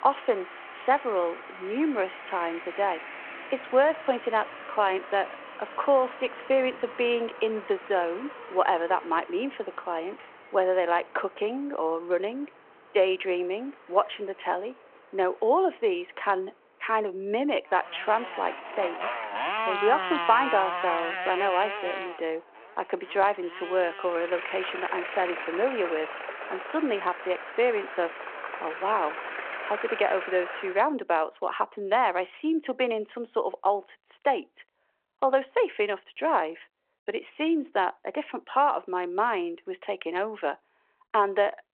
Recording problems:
phone-call audio
traffic noise; loud; until 31 s; 8 dB below the speech

